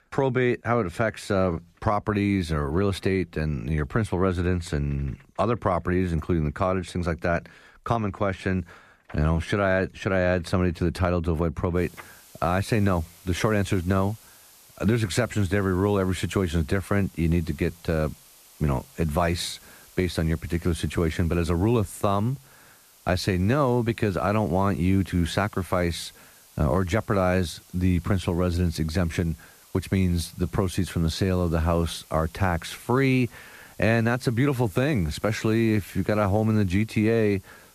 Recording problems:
hiss; faint; from 12 s on; 25 dB below the speech

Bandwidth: 14.5 kHz